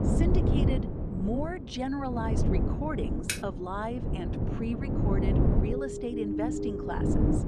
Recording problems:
wind noise on the microphone; heavy; 1 dB below the speech
keyboard typing; loud; at 3.5 s; peak 2 dB above the speech
siren; loud; from 5.5 s on; peak 4 dB above the speech

